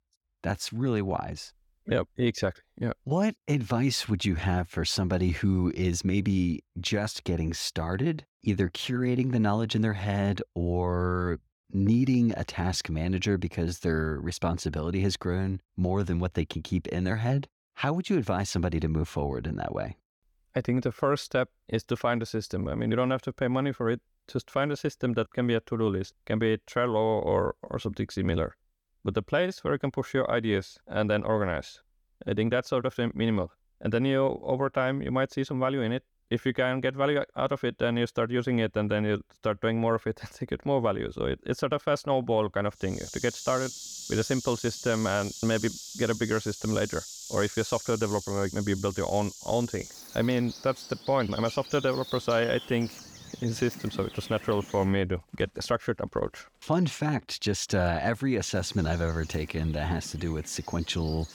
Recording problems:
animal sounds; noticeable; from 43 s on; 10 dB below the speech

